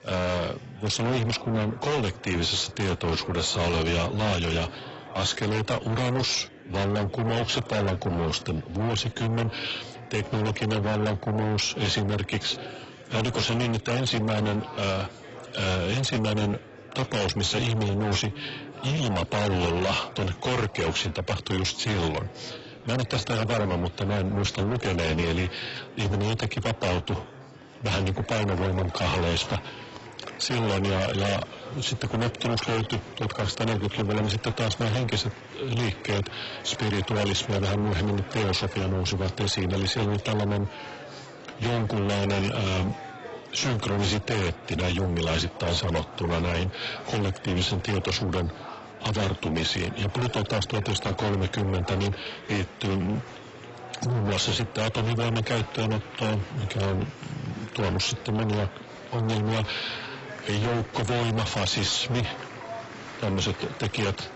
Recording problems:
distortion; heavy; 6 dB below the speech
garbled, watery; badly; nothing above 8 kHz
murmuring crowd; noticeable; throughout; 15 dB below the speech

